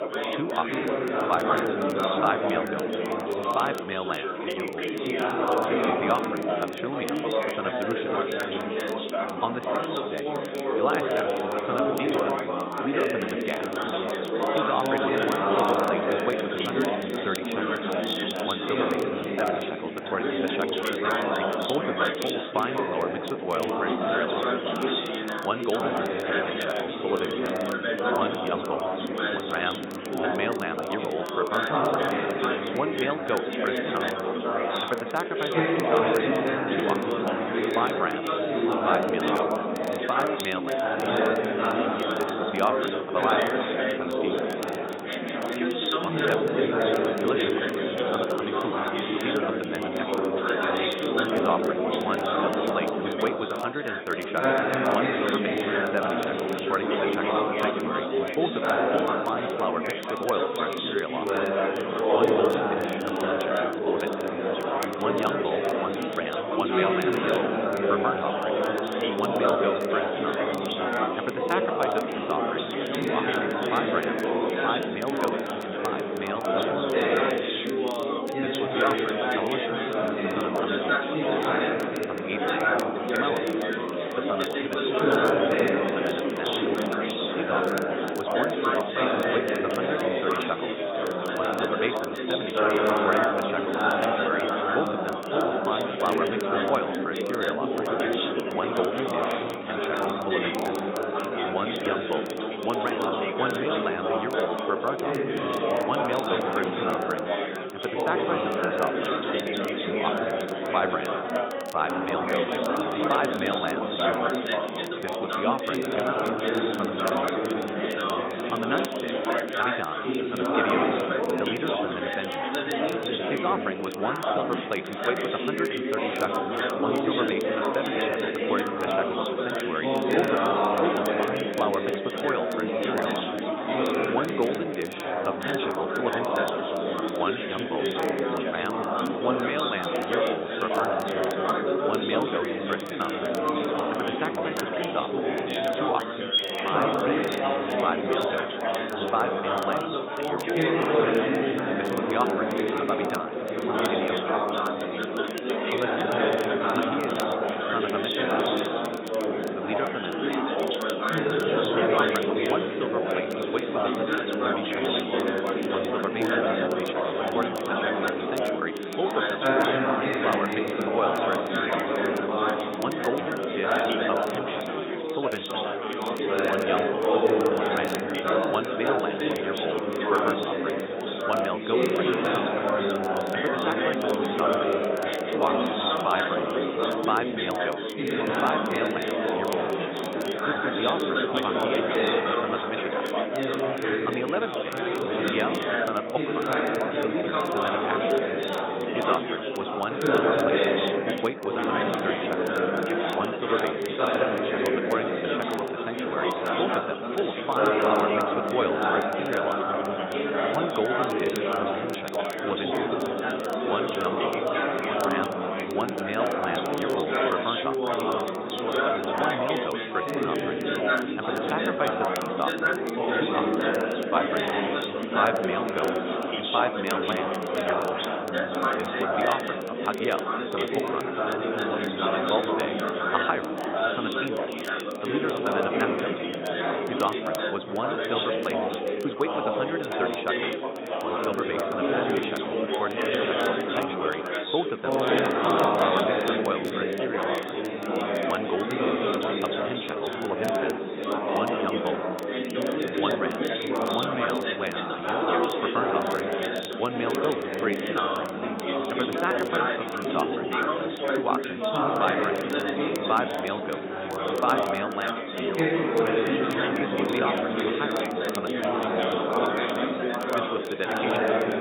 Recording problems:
high frequencies cut off; severe; nothing above 4 kHz
thin; somewhat; fading below 400 Hz
chatter from many people; very loud; throughout; 5 dB above the speech
crackle, like an old record; noticeable; 15 dB below the speech

